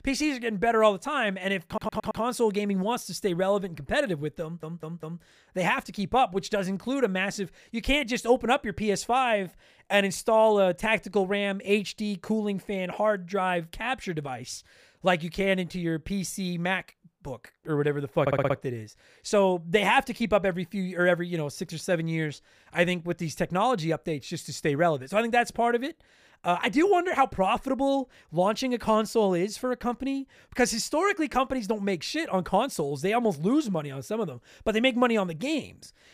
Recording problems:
audio stuttering; at 1.5 s, at 4.5 s and at 18 s

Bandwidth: 15 kHz